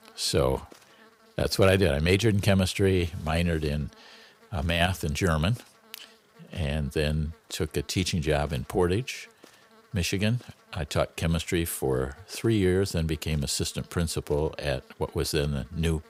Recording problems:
electrical hum; faint; throughout; 60 Hz, 25 dB below the speech

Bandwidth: 15.5 kHz